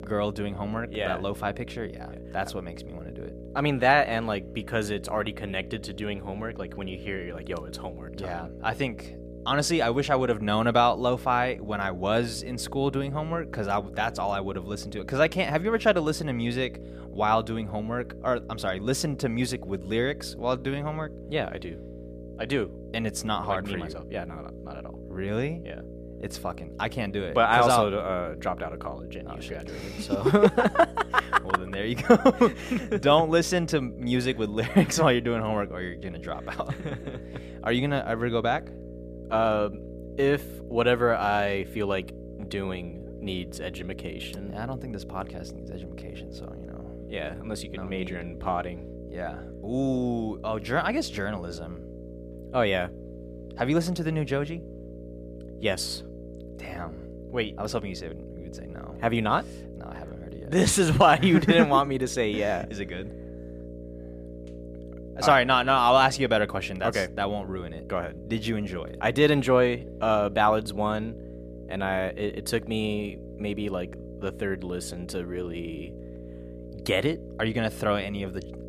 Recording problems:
electrical hum; noticeable; throughout; 60 Hz, 20 dB below the speech

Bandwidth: 14.5 kHz